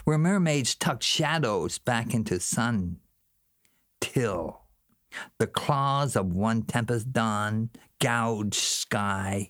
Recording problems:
squashed, flat; heavily

